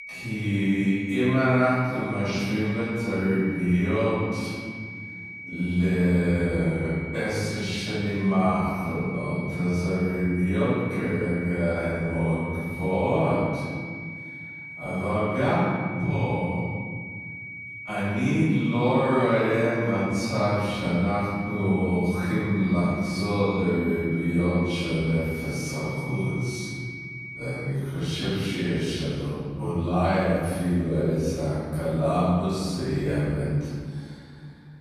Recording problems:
room echo; strong; dies away in 2 s
off-mic speech; far
wrong speed, natural pitch; too slow; 0.5 times normal speed
high-pitched whine; noticeable; until 28 s; 2.5 kHz, 10 dB below the speech

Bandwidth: 14.5 kHz